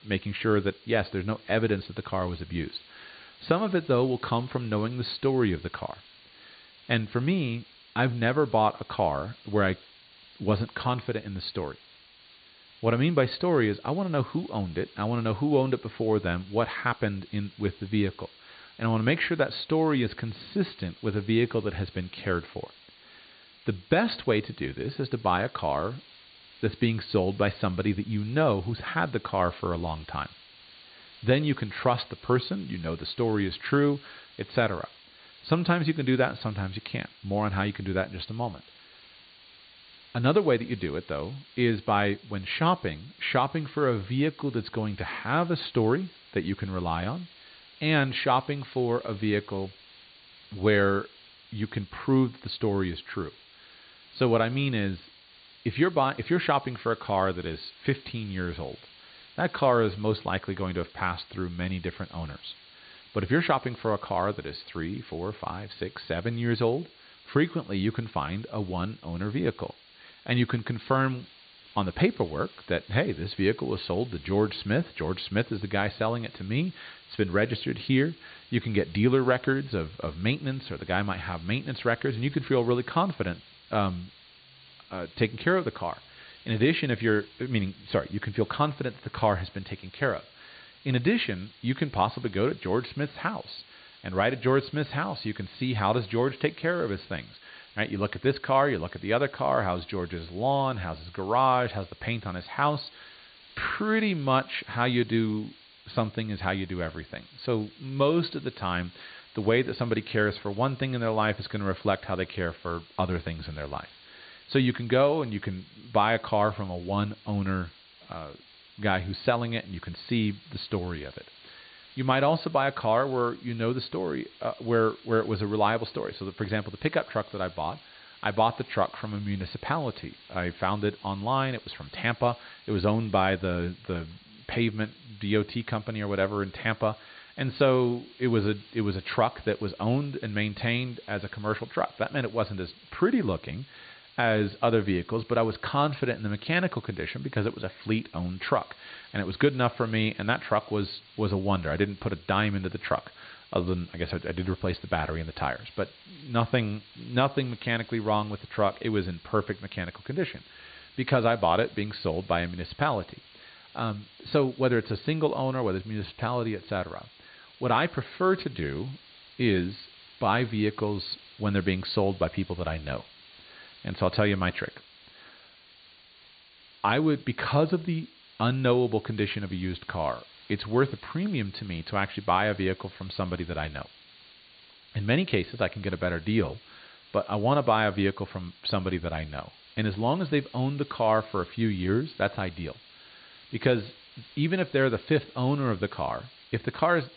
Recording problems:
high frequencies cut off; severe; nothing above 4.5 kHz
hiss; faint; throughout; 25 dB below the speech

